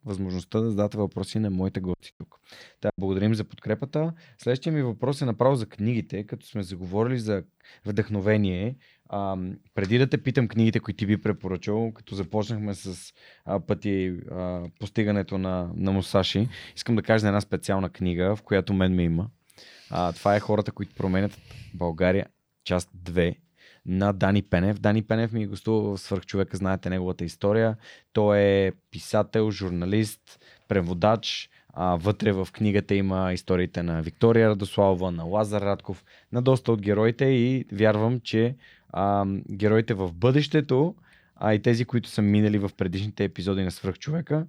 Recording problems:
choppy; very; from 2 to 3 s; 11% of the speech affected

